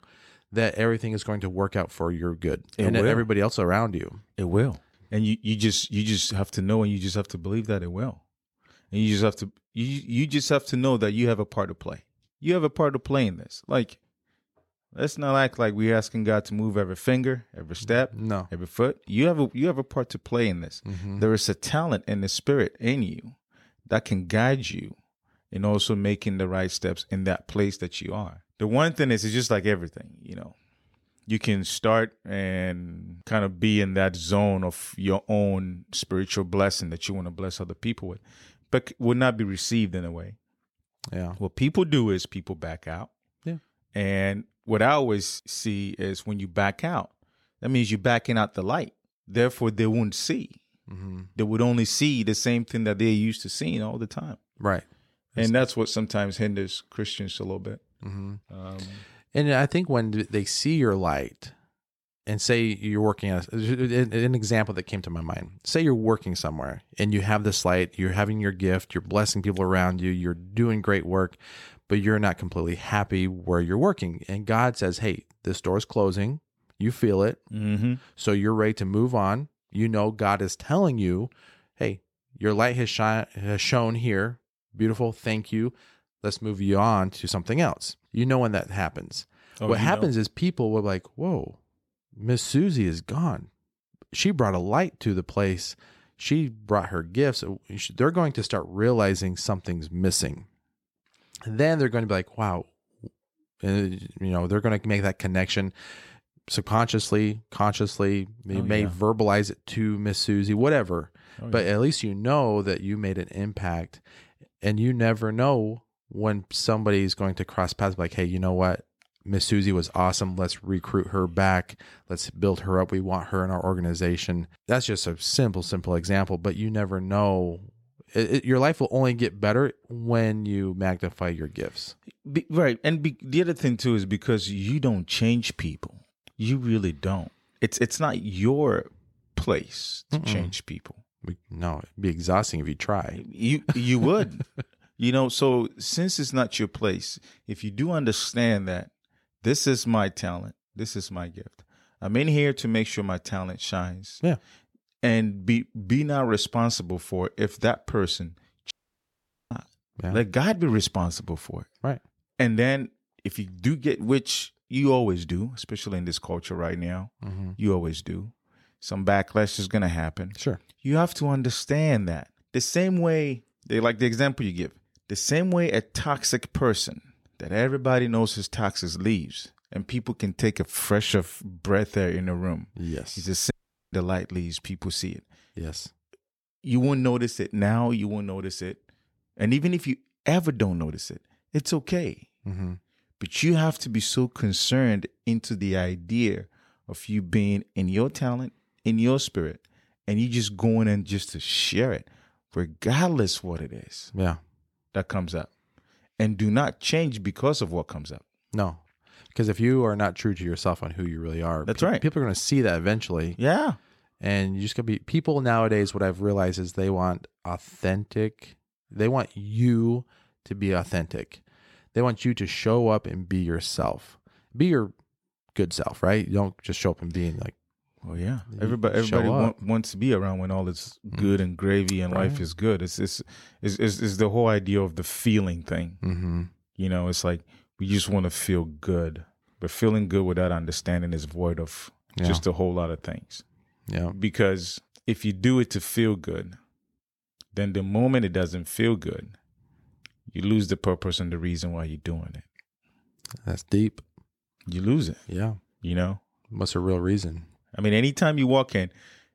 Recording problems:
audio cutting out; at 2:39 for 1 s and at 3:04

